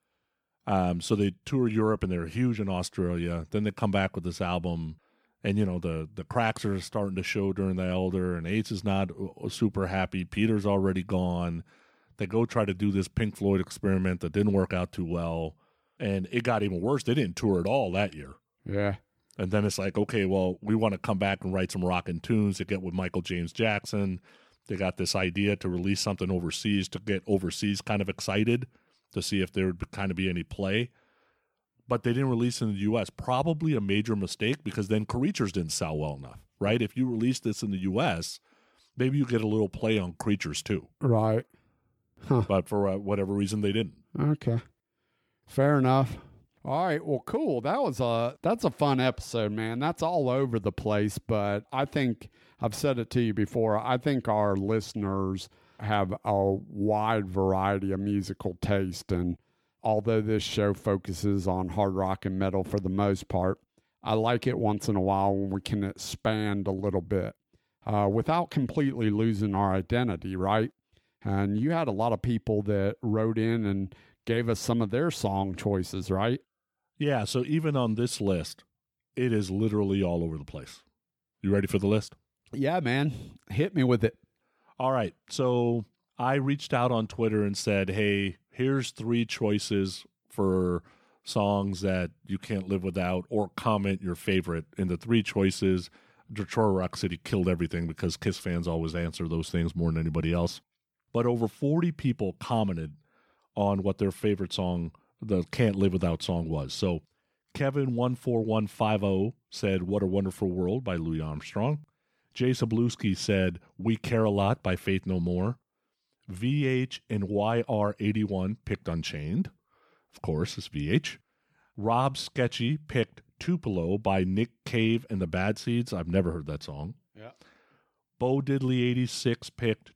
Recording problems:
none

